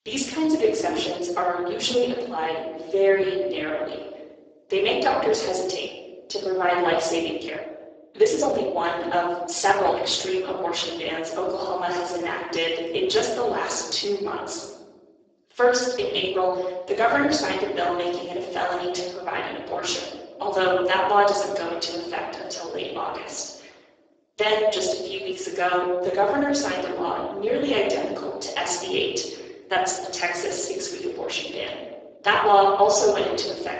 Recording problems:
off-mic speech; far
garbled, watery; badly; nothing above 7.5 kHz
thin; very; fading below 350 Hz
room echo; noticeable; dies away in 1.2 s
uneven, jittery; strongly; from 7.5 to 33 s

